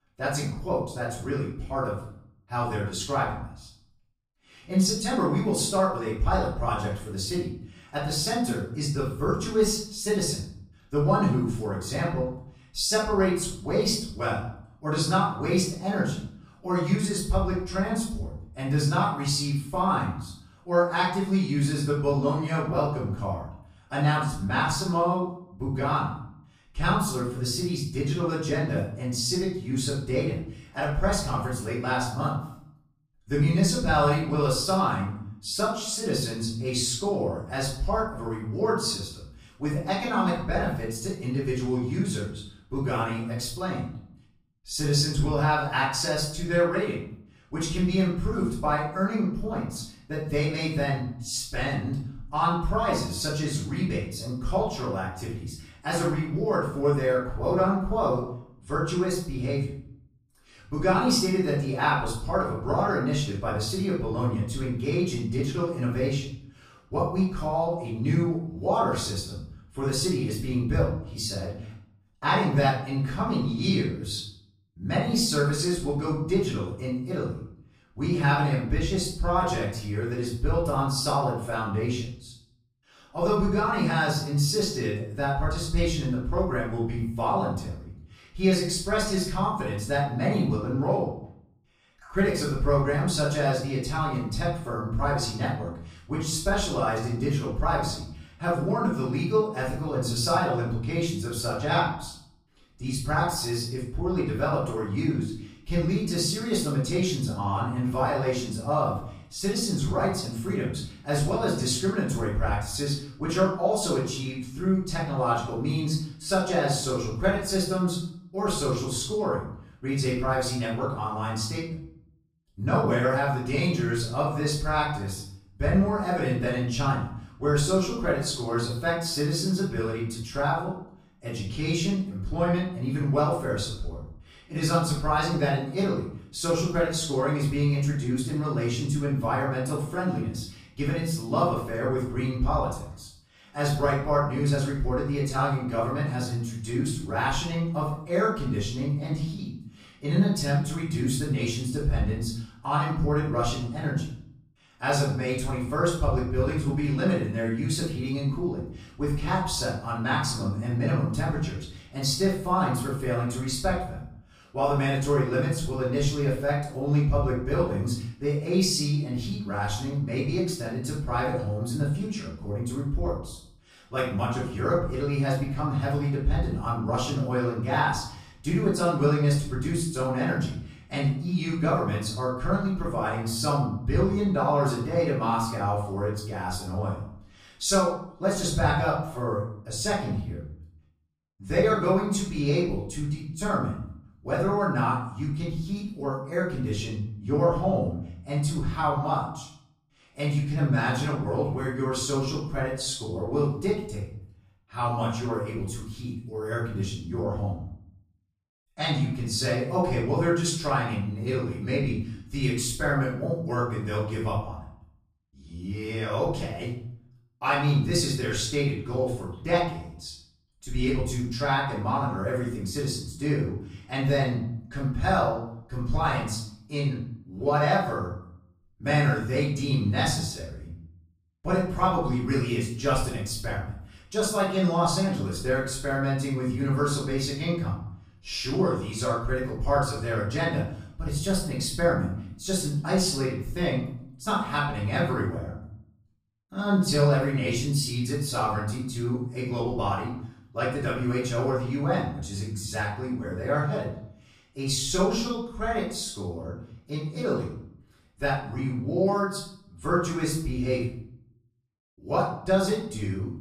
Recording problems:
off-mic speech; far
room echo; noticeable; dies away in 0.6 s

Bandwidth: 15 kHz